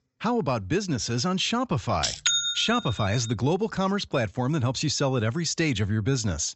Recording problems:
high frequencies cut off; noticeable; nothing above 7.5 kHz

